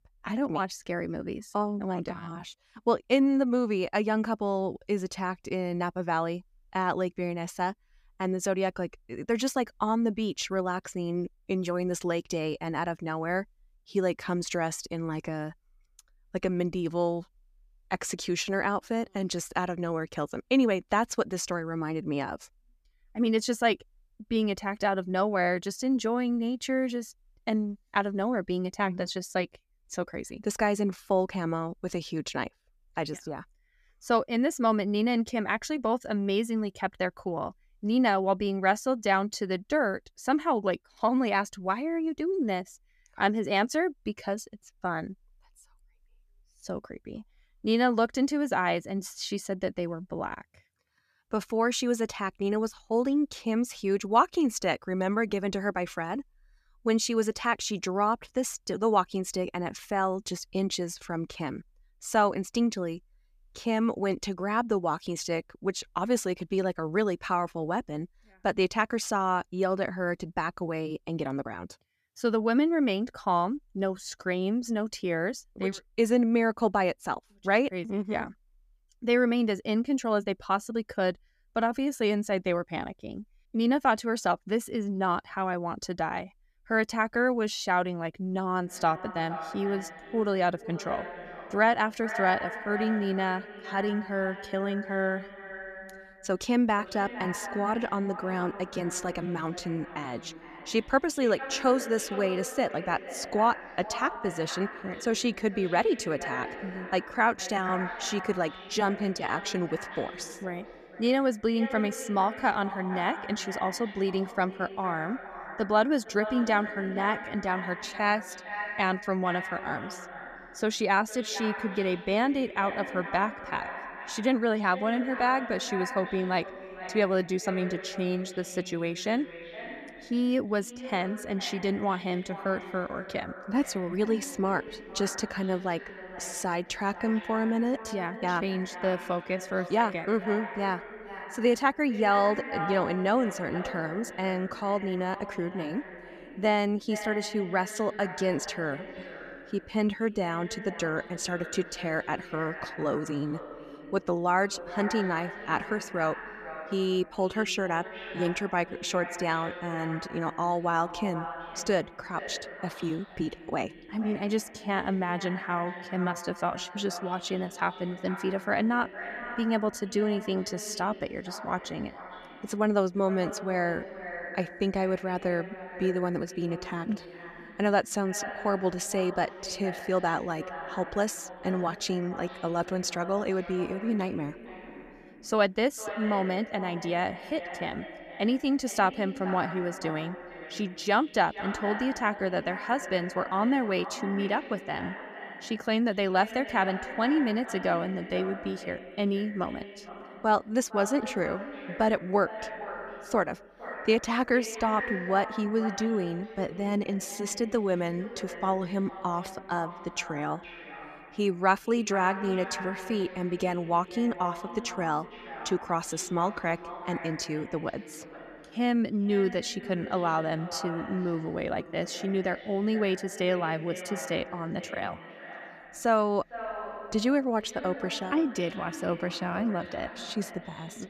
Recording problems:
echo of what is said; strong; from 1:29 on; 450 ms later, 10 dB below the speech

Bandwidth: 14.5 kHz